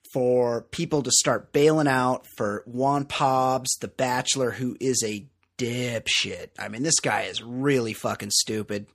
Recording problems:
none

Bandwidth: 15 kHz